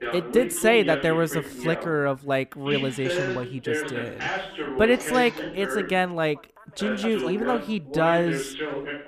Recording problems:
background chatter; loud; throughout; 2 voices, 6 dB below the speech

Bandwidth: 14.5 kHz